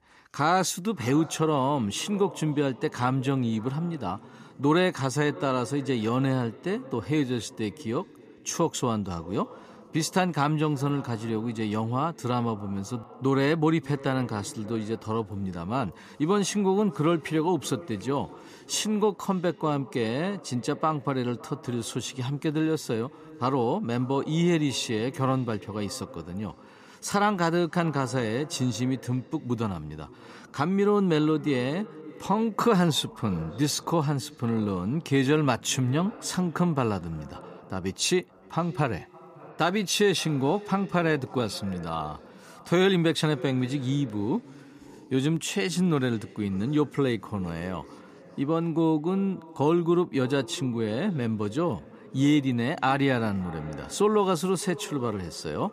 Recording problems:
echo of what is said; faint; throughout; 560 ms later, 20 dB below the speech

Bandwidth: 14.5 kHz